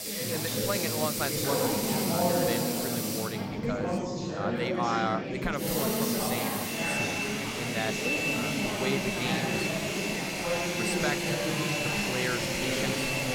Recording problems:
household noises; very loud; throughout; 4 dB above the speech
chatter from many people; very loud; throughout; 4 dB above the speech

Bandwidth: 18.5 kHz